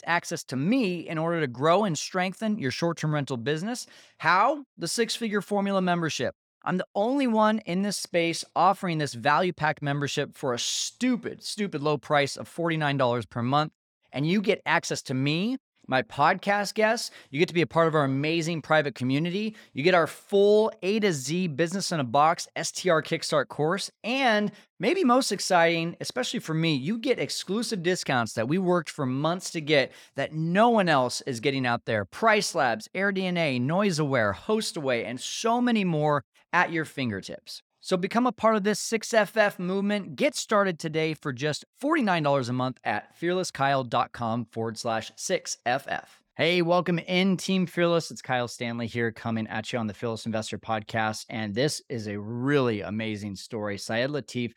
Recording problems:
none

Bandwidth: 18.5 kHz